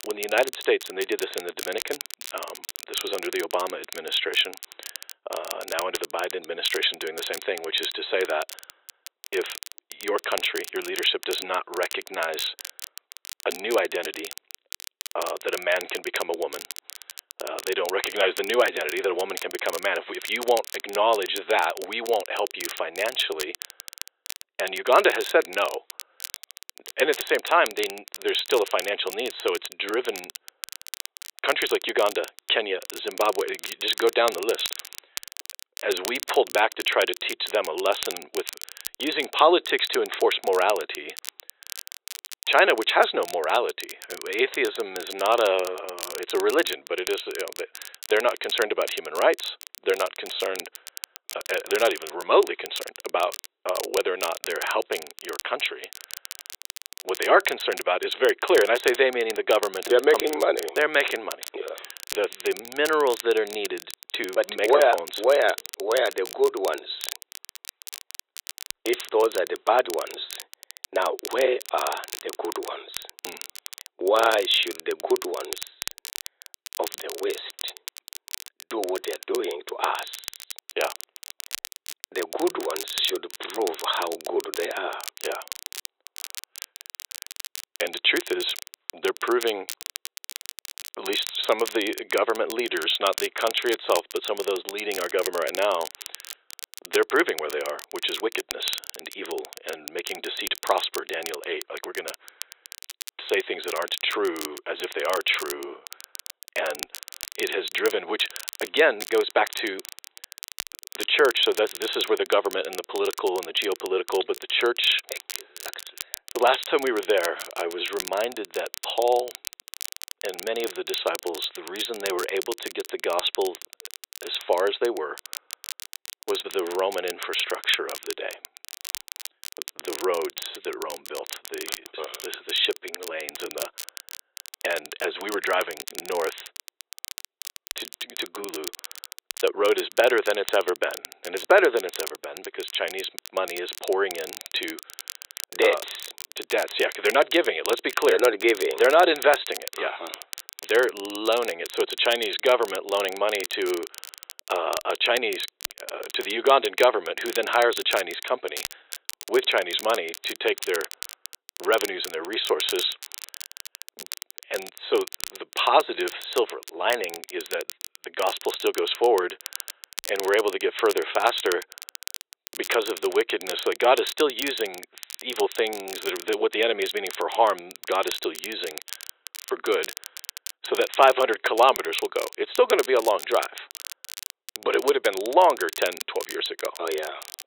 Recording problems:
thin; very; fading below 350 Hz
high frequencies cut off; severe; nothing above 4 kHz
crackle, like an old record; noticeable; 10 dB below the speech

